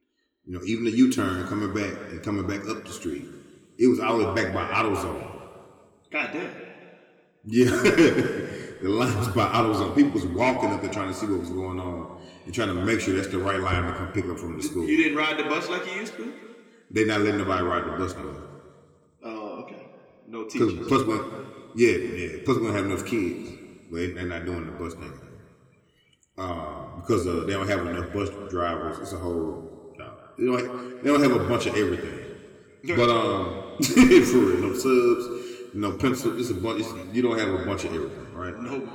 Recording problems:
room echo; slight; dies away in 1.9 s
off-mic speech; somewhat distant

